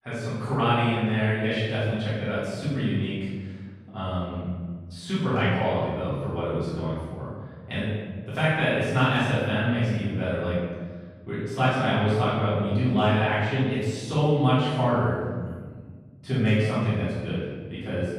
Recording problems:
room echo; strong; dies away in 1.4 s
off-mic speech; far

